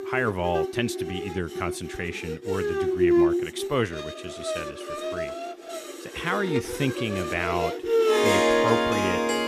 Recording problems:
background music; very loud; throughout; 4 dB above the speech

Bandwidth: 14.5 kHz